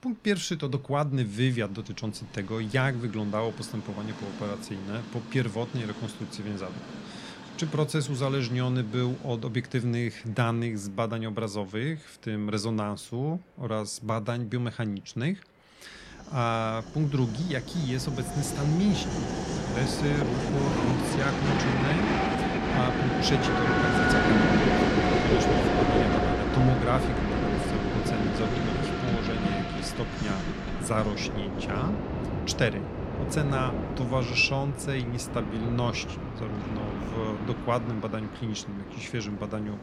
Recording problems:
train or aircraft noise; very loud; throughout; 2 dB above the speech

